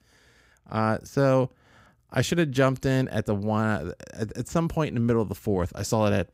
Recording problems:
none

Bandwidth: 15.5 kHz